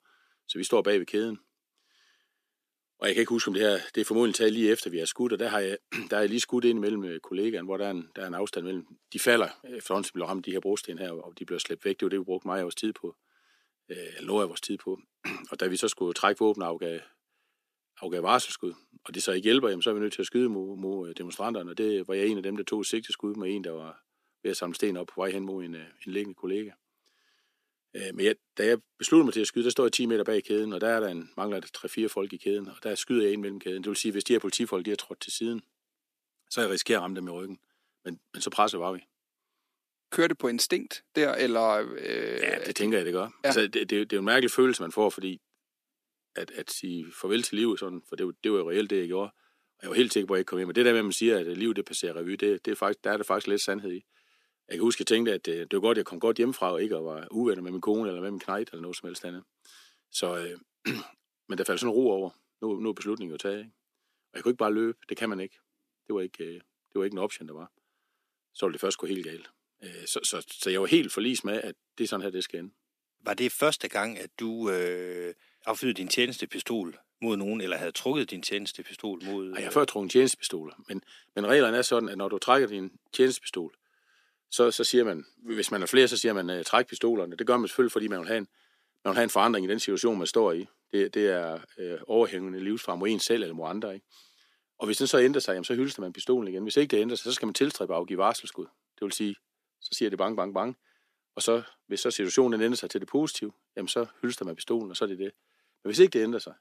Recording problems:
thin; somewhat; fading below 250 Hz

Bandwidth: 14.5 kHz